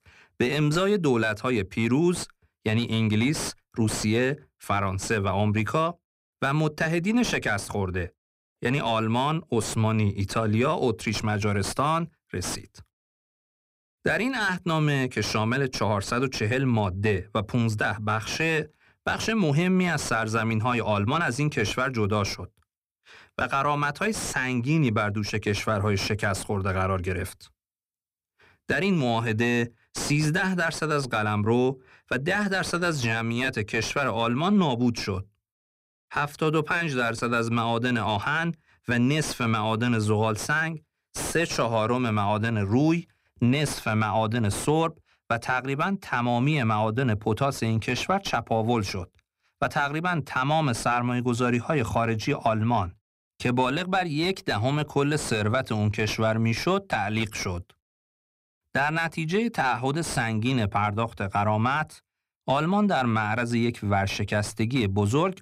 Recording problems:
distortion; slight; 10 dB below the speech

